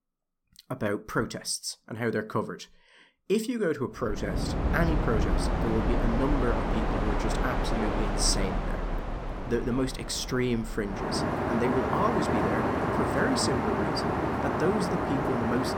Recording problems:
train or aircraft noise; very loud; from 4.5 s on; 1 dB above the speech

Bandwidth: 17 kHz